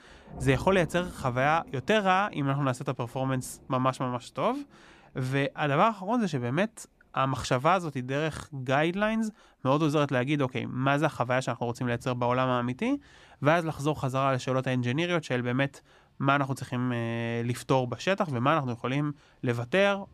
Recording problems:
rain or running water; faint; throughout; 20 dB below the speech

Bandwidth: 14.5 kHz